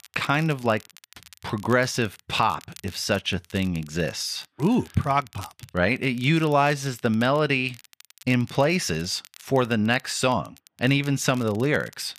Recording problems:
crackle, like an old record; faint; 25 dB below the speech

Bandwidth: 14.5 kHz